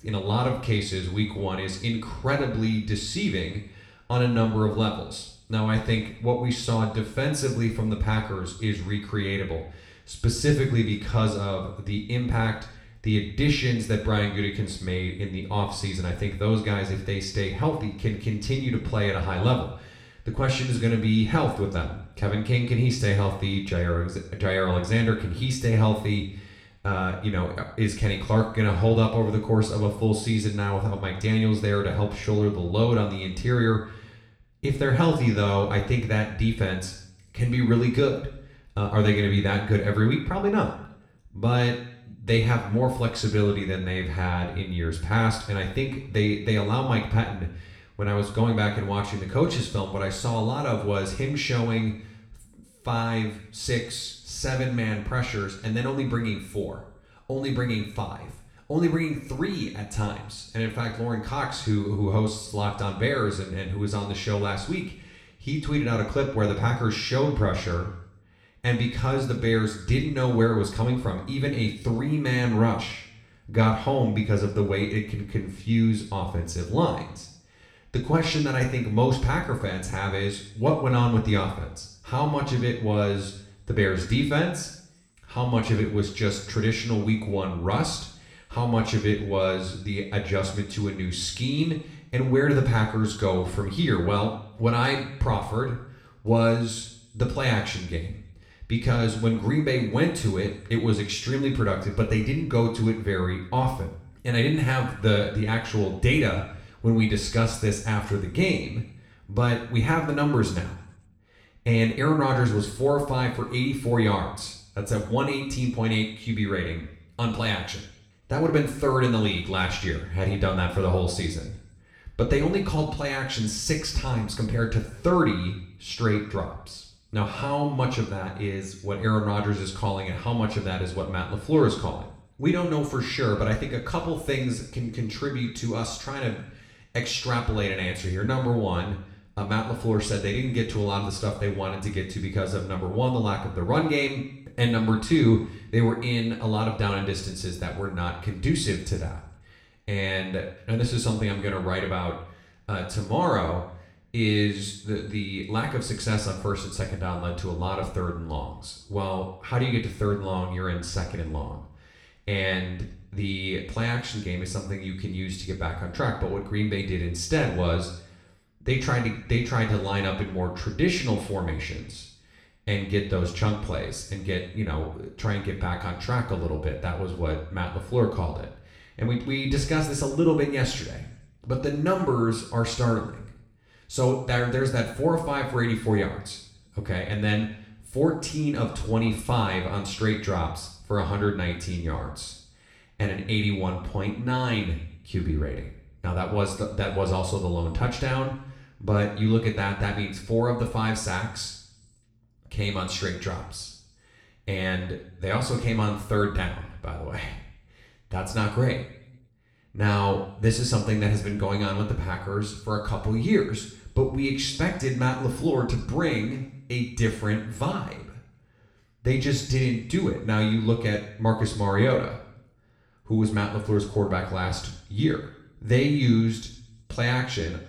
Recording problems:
room echo; slight; dies away in 0.6 s
off-mic speech; somewhat distant

